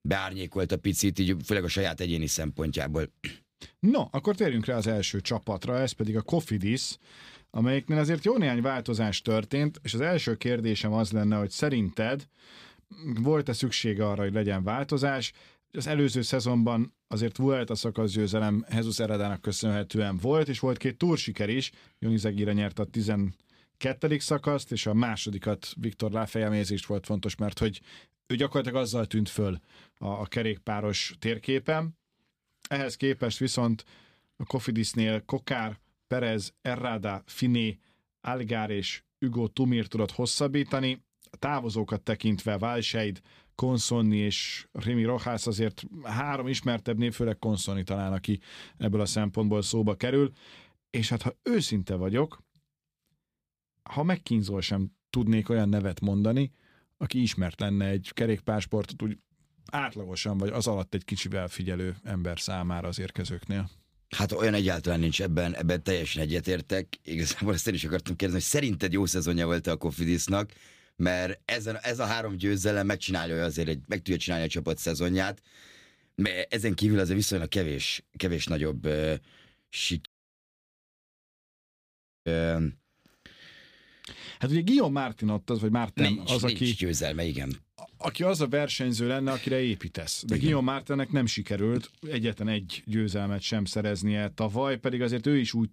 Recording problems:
audio cutting out; at 1:20 for 2 s

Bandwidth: 15 kHz